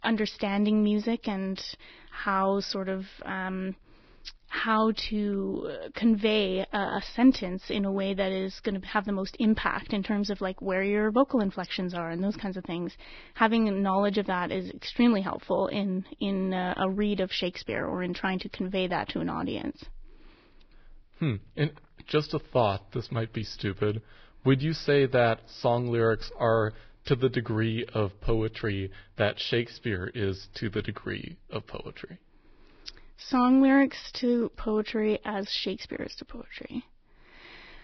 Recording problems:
garbled, watery; badly; nothing above 5.5 kHz

